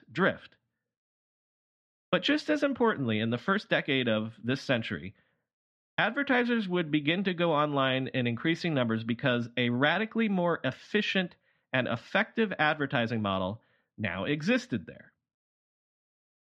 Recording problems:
muffled; slightly; fading above 2.5 kHz

